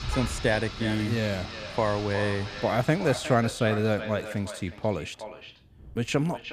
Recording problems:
echo of what is said; noticeable; throughout; 360 ms later, 10 dB below the speech
rain or running water; noticeable; throughout; 10 dB below the speech

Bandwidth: 14.5 kHz